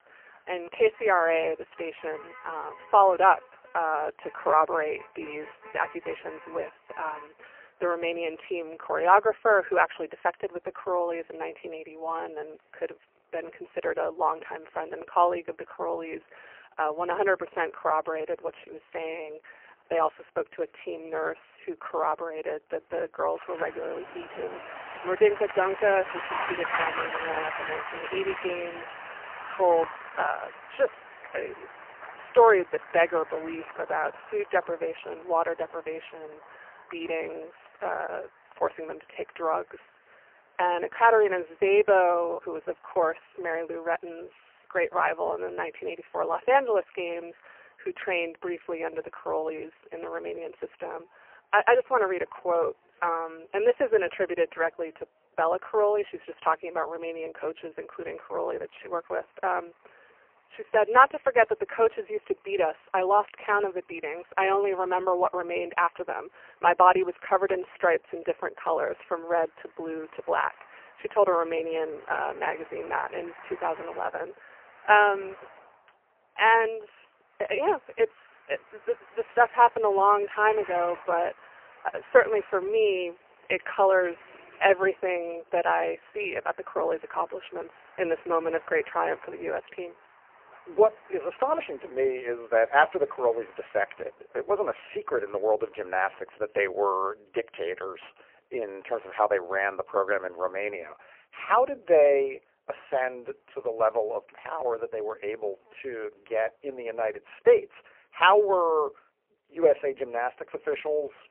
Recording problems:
phone-call audio; poor line; nothing above 3 kHz
traffic noise; noticeable; throughout; 15 dB below the speech

